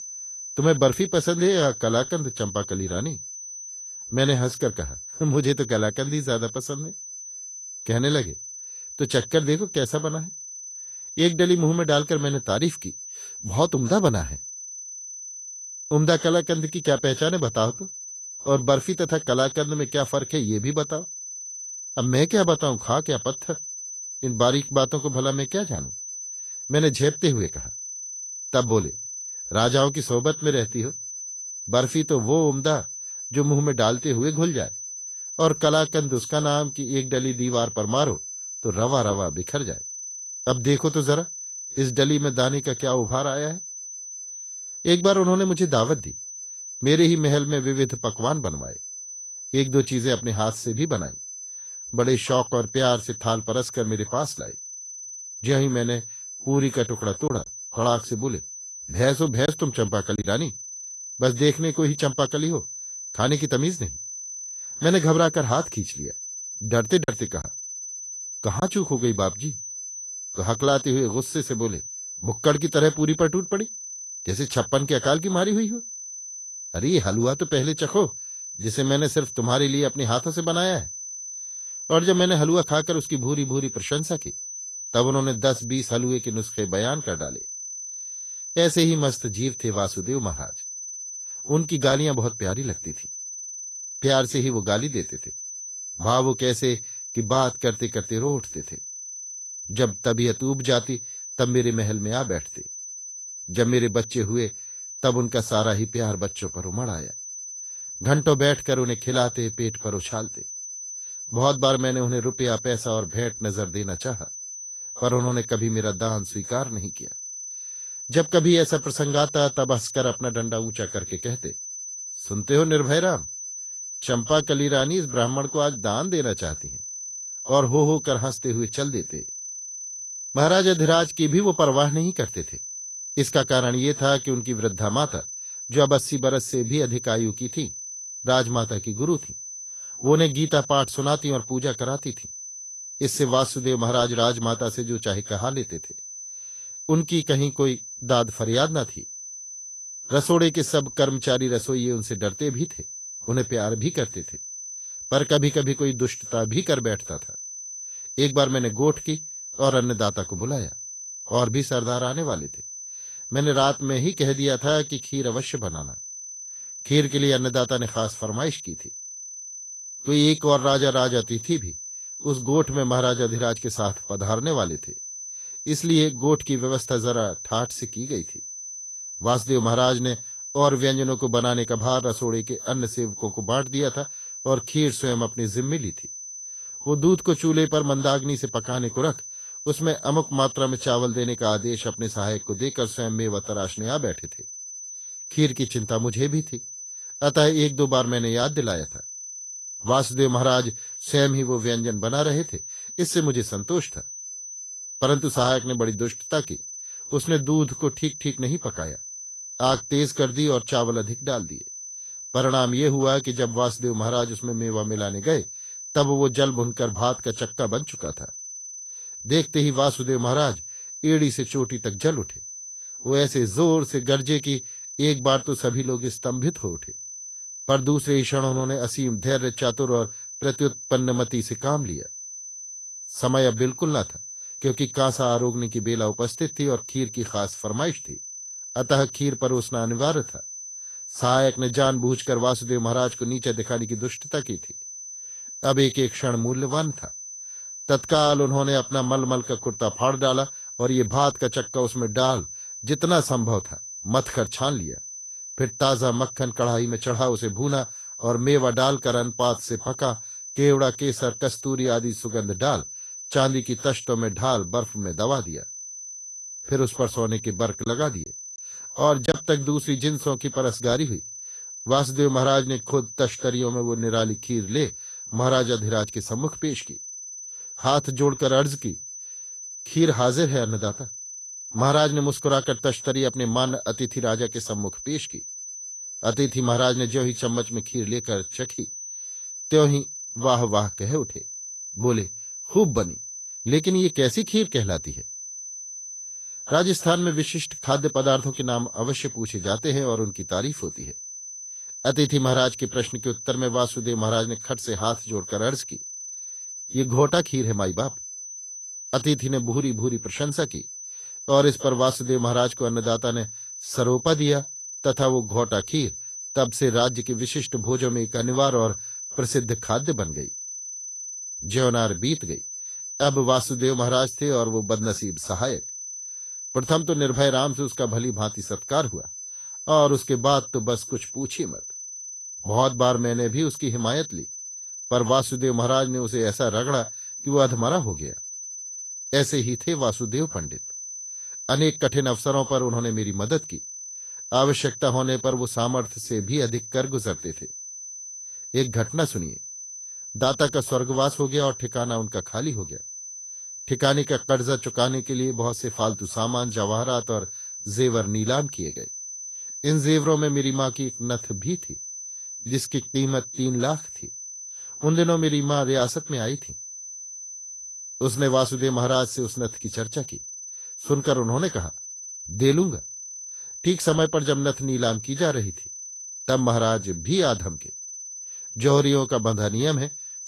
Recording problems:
garbled, watery; slightly; nothing above 12.5 kHz
high-pitched whine; noticeable; throughout; 6 kHz, 10 dB below the speech
choppy; occasionally; from 57 s to 1:00, from 1:07 to 1:09 and from 4:28 to 4:29; 5% of the speech affected

